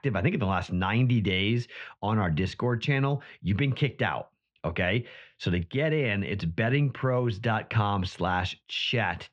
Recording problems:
muffled; very; fading above 3 kHz

